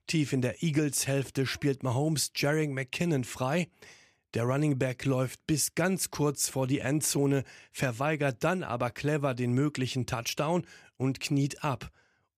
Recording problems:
none

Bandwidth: 14.5 kHz